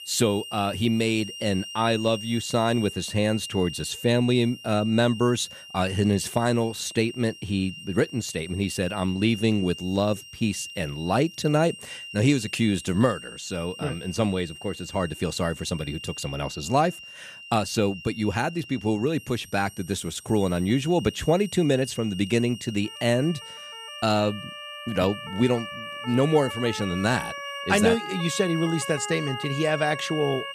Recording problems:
background music; noticeable; throughout; 15 dB below the speech
siren; noticeable; from 23 s on; peak 8 dB below the speech

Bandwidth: 14.5 kHz